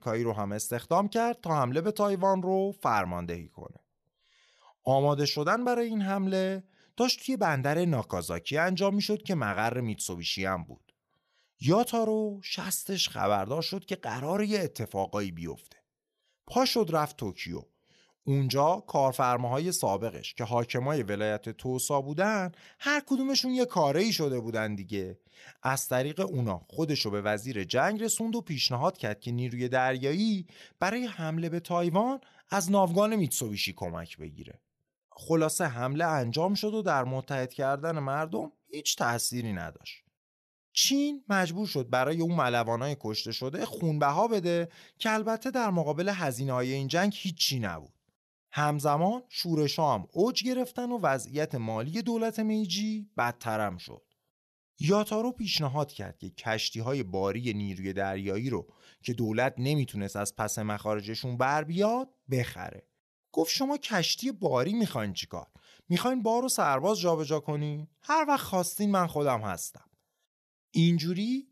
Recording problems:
none

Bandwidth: 13.5 kHz